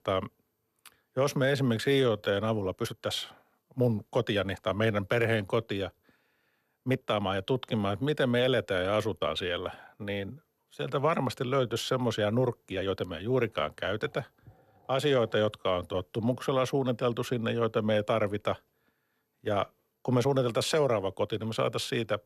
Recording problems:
uneven, jittery; strongly; from 1.5 to 21 s

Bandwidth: 13.5 kHz